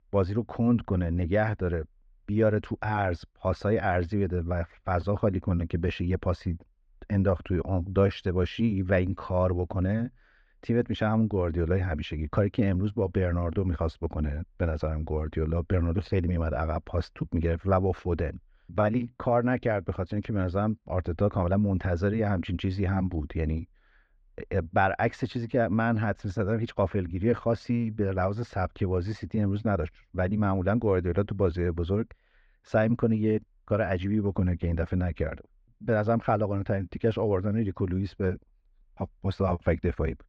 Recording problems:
muffled; slightly; fading above 2 kHz

